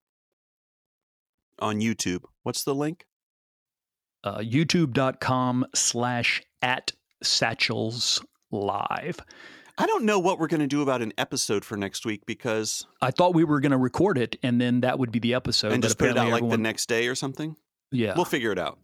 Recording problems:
none

